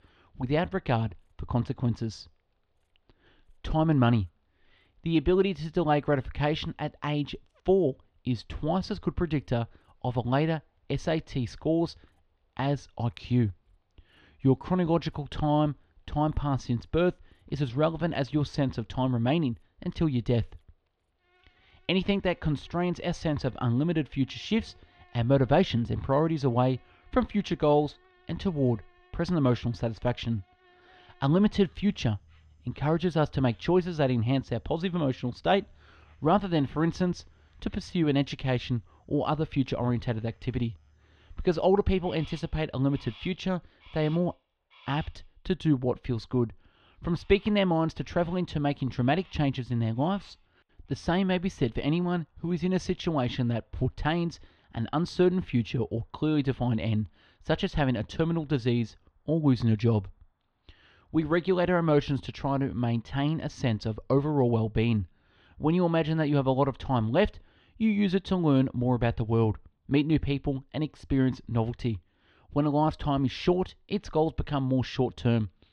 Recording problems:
muffled; slightly; fading above 4 kHz
animal sounds; faint; throughout; 30 dB below the speech

